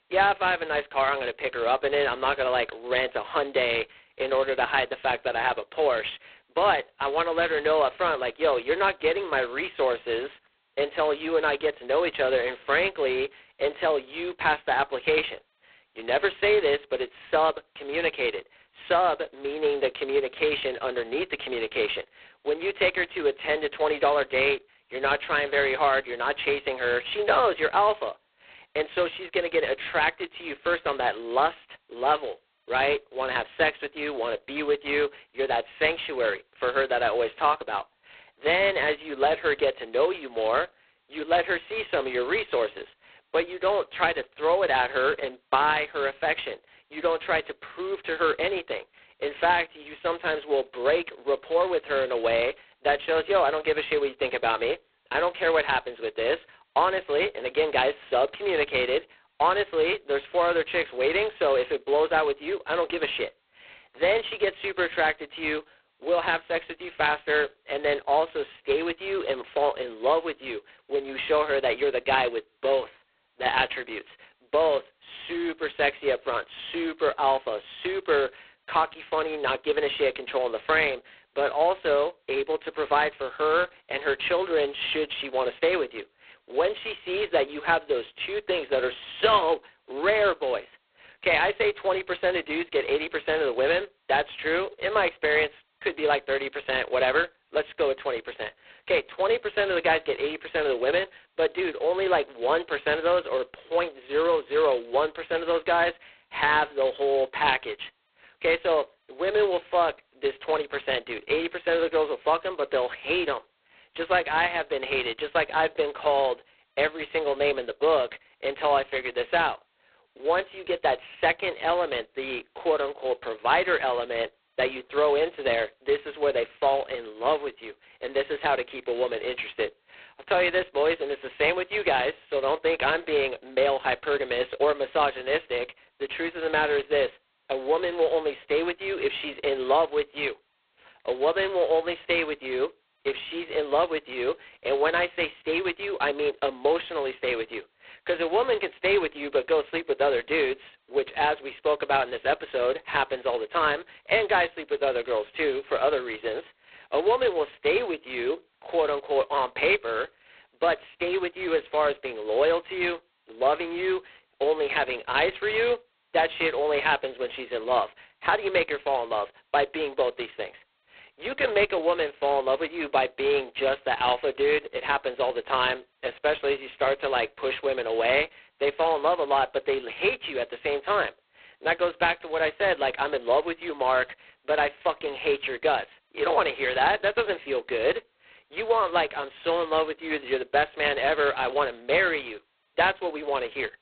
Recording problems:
phone-call audio; poor line; nothing above 4 kHz

